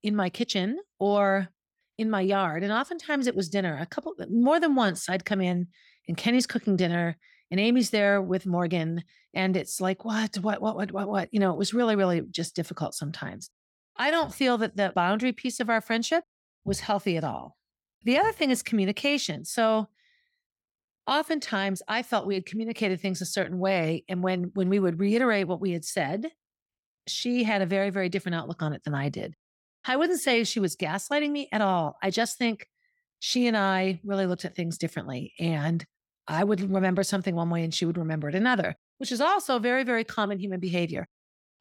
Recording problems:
none

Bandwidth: 17 kHz